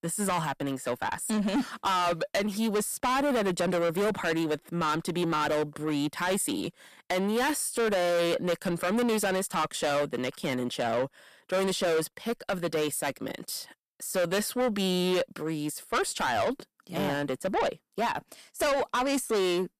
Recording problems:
distortion; heavy; 6 dB below the speech

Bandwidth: 14.5 kHz